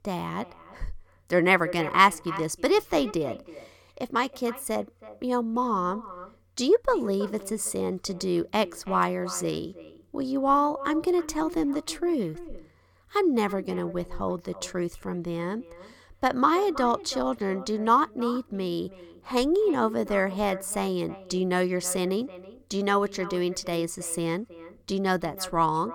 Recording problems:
echo of what is said; noticeable; throughout; 320 ms later, 15 dB below the speech

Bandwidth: 18 kHz